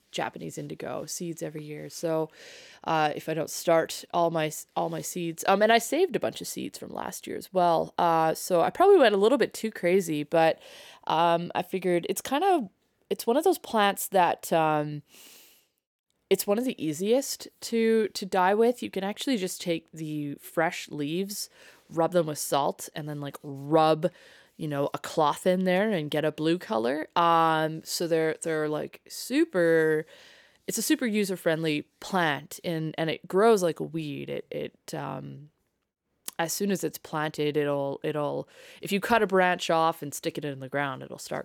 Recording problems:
none

